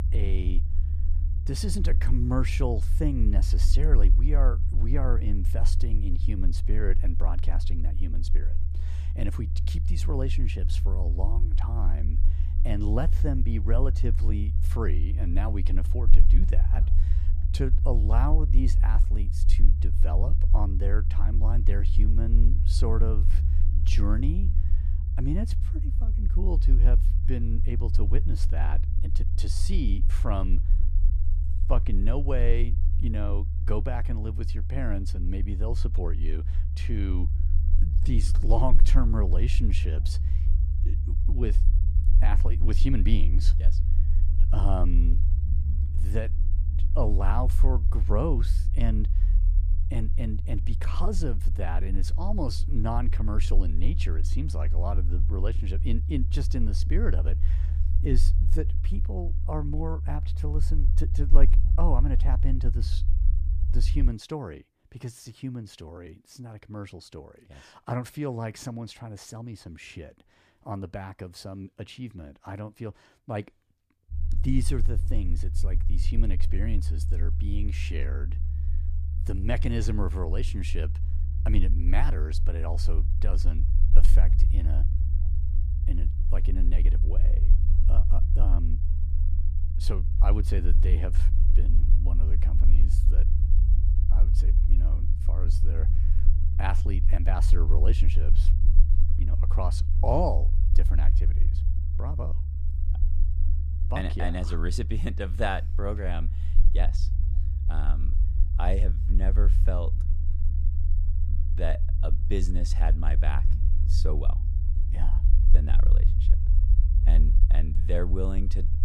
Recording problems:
low rumble; loud; until 1:04 and from 1:14 on; 9 dB below the speech

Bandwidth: 14.5 kHz